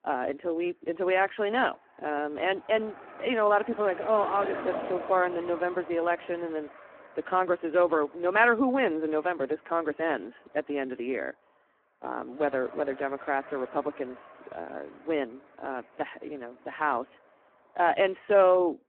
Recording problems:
phone-call audio; poor line
traffic noise; noticeable; throughout; 15 dB below the speech

